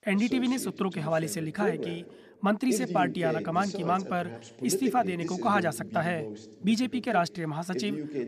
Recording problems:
voice in the background; loud; throughout; 7 dB below the speech

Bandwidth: 14.5 kHz